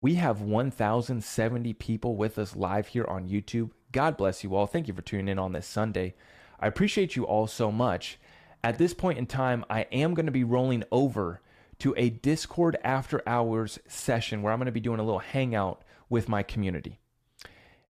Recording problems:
none

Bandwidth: 14.5 kHz